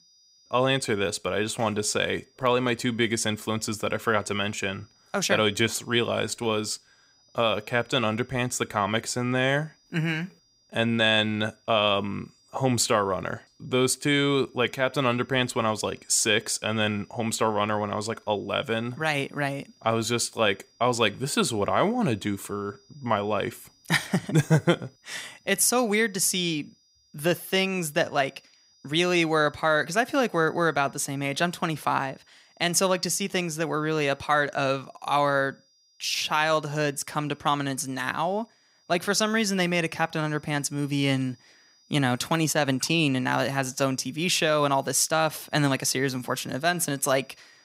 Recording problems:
high-pitched whine; faint; throughout; 5 kHz, 35 dB below the speech

